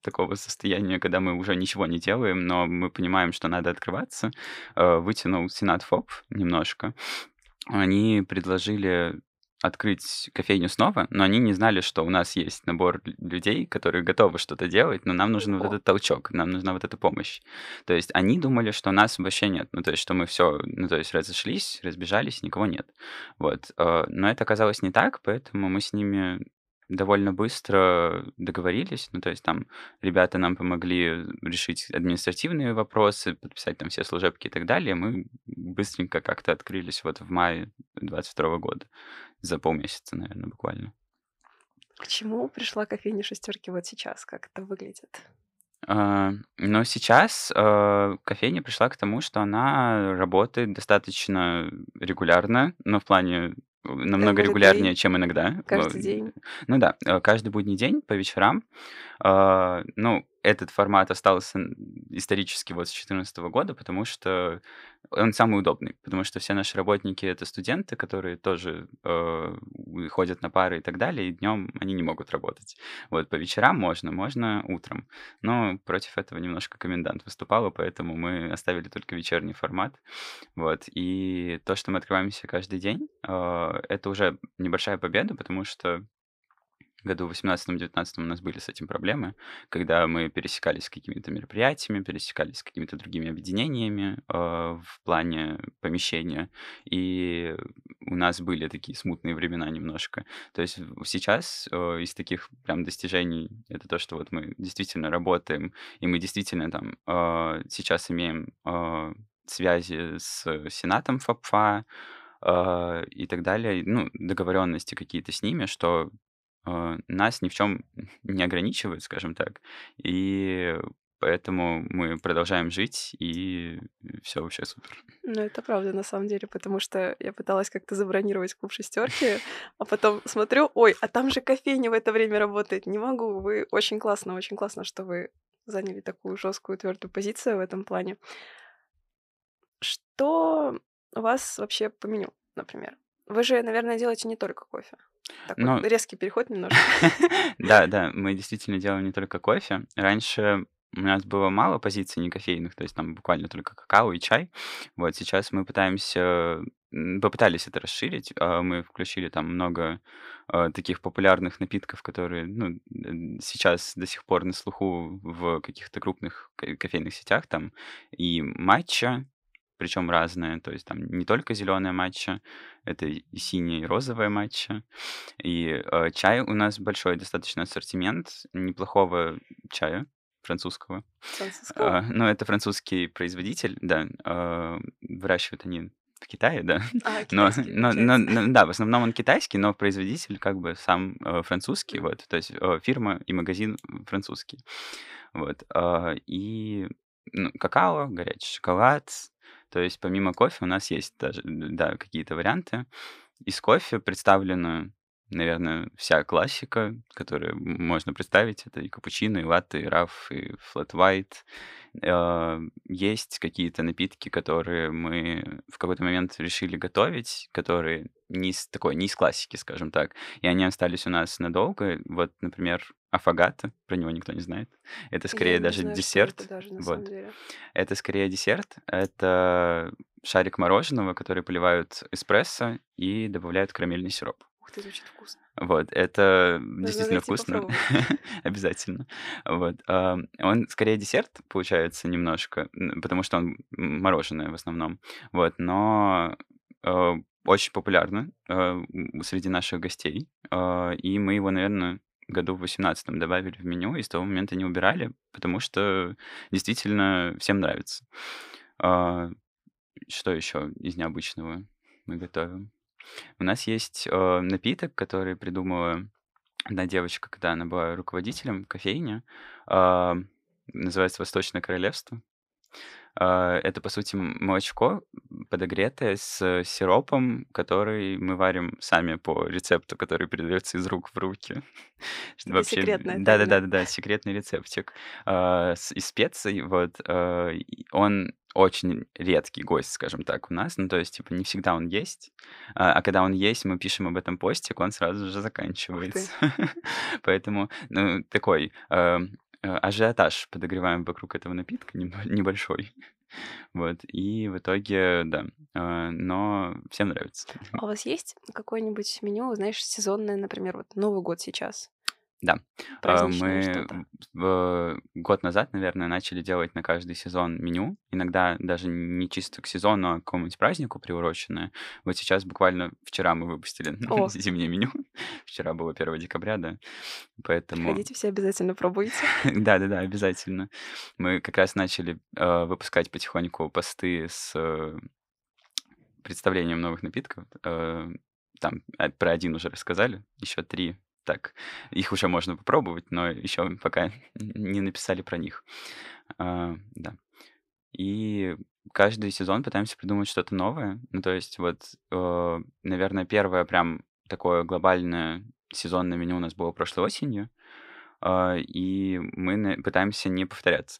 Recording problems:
none

